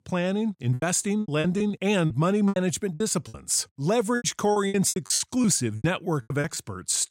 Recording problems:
choppy; very; 16% of the speech affected

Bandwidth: 16 kHz